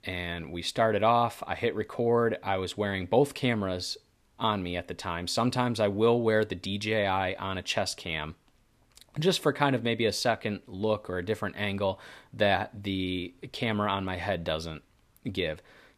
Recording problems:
none

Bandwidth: 14.5 kHz